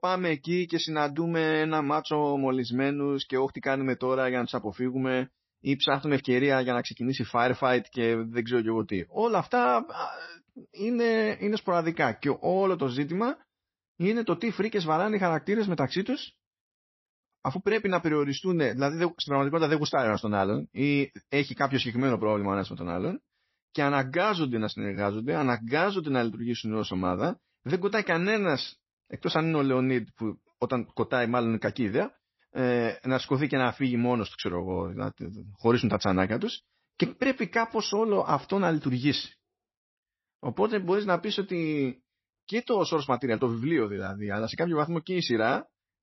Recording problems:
garbled, watery; slightly; nothing above 5.5 kHz

